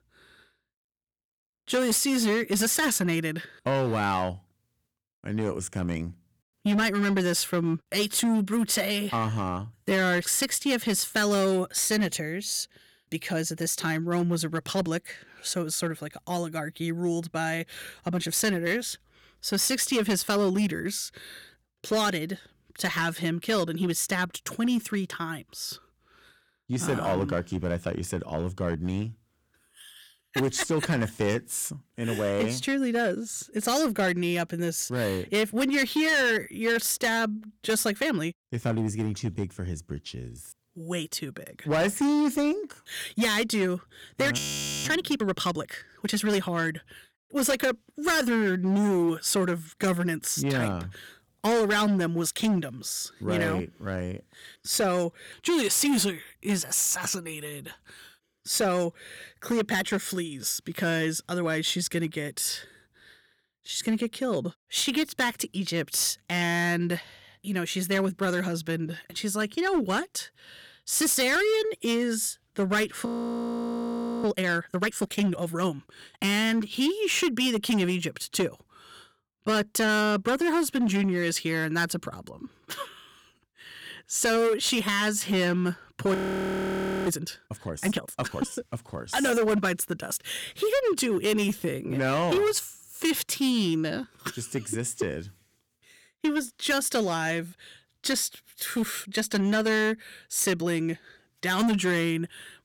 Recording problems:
distortion; slight; 8% of the sound clipped
audio freezing; at 44 s, at 1:13 for 1 s and at 1:26 for 1 s

